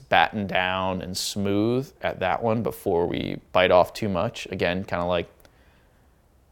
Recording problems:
none

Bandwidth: 17 kHz